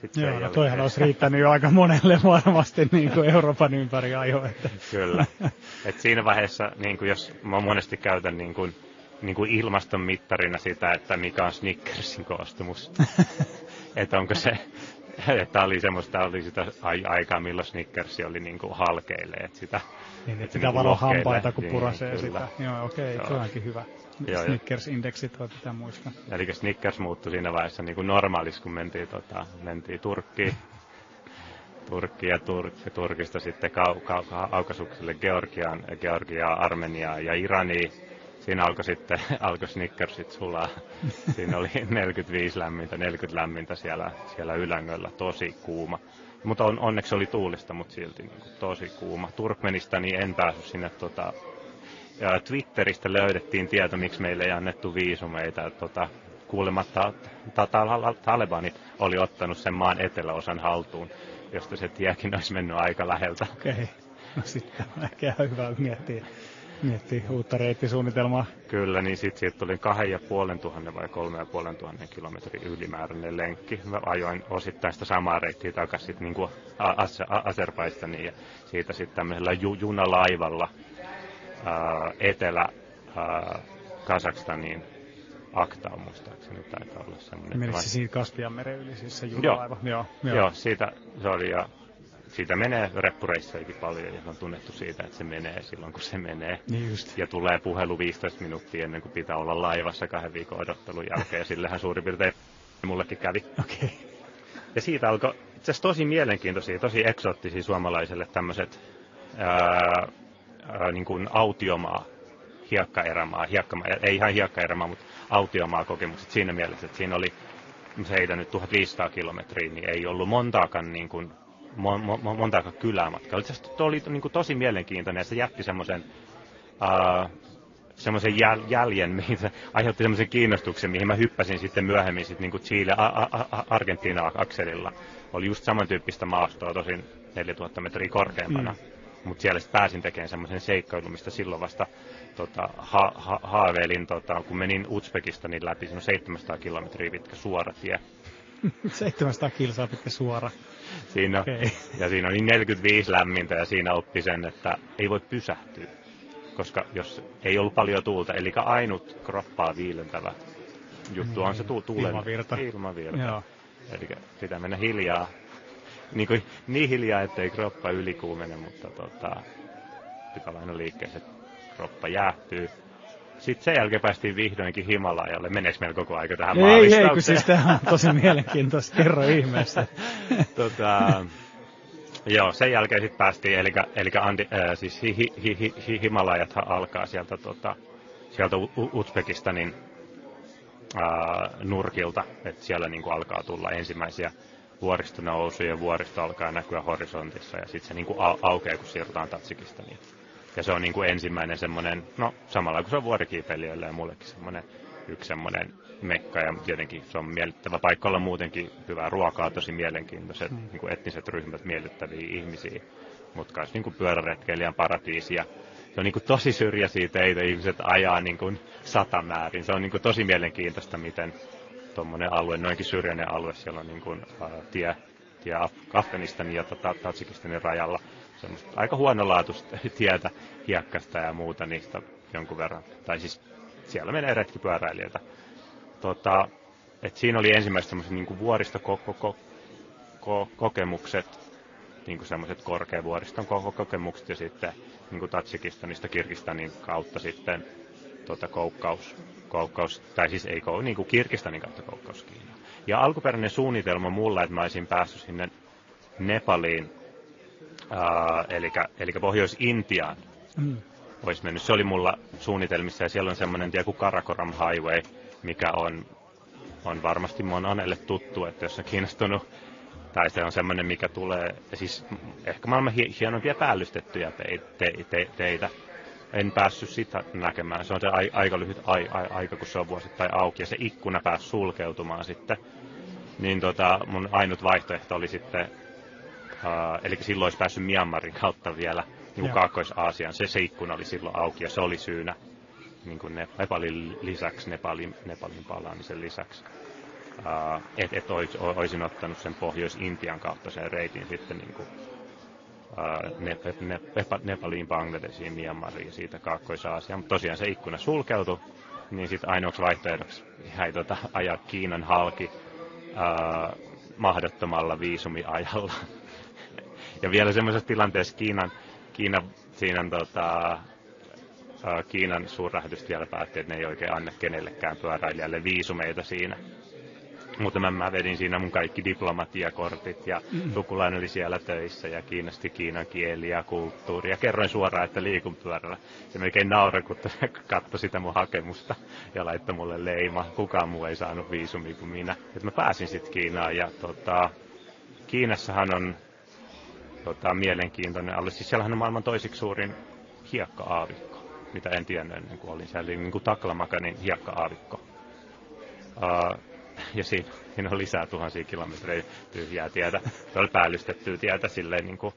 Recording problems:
high frequencies cut off; noticeable; nothing above 7 kHz
garbled, watery; slightly
chatter from many people; faint; throughout; 20 dB below the speech
audio freezing; at 1:42 for 0.5 s

